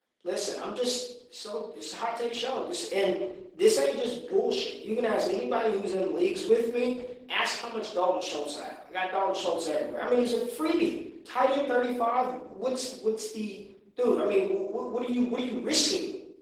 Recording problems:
off-mic speech; far
room echo; noticeable; dies away in 0.6 s
garbled, watery; slightly
thin; very slightly; fading below 250 Hz

